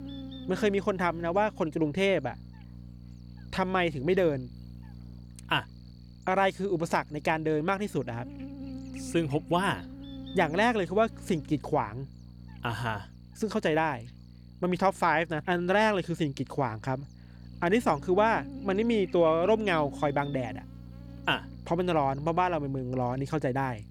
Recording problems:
electrical hum; faint; throughout; 60 Hz, 25 dB below the speech

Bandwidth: 18.5 kHz